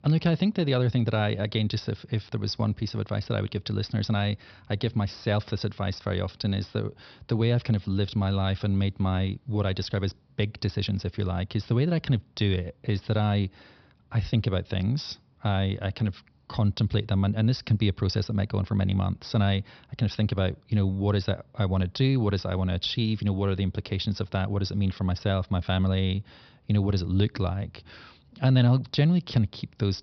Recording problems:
high frequencies cut off; noticeable; nothing above 5.5 kHz

